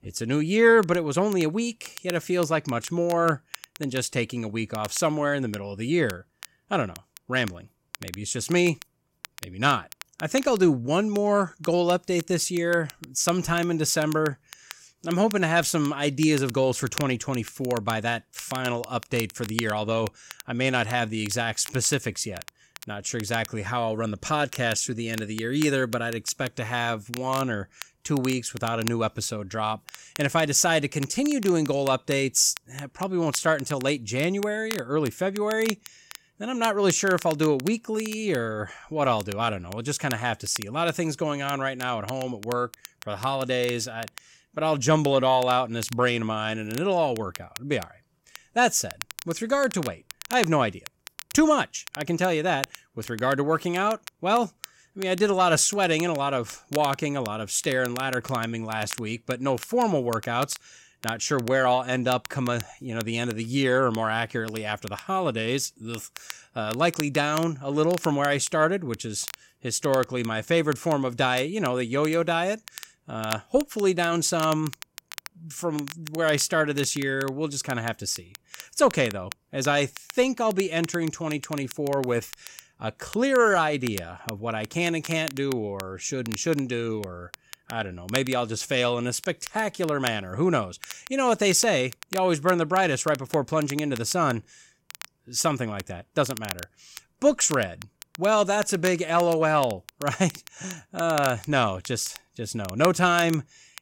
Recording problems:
crackle, like an old record; noticeable; 15 dB below the speech

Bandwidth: 16 kHz